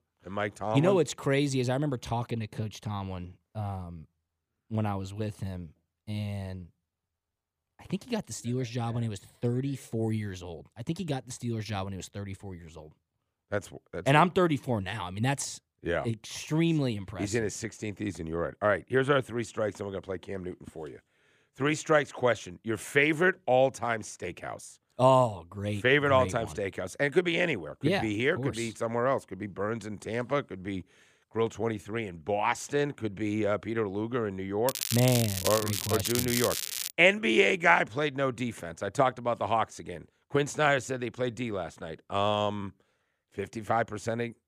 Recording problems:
crackling; loud; from 35 to 37 s; 2 dB below the speech

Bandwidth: 15 kHz